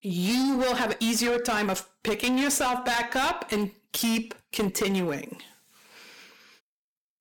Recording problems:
distortion; heavy; 18% of the sound clipped
uneven, jittery; slightly; from 0.5 to 5.5 s

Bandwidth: 17.5 kHz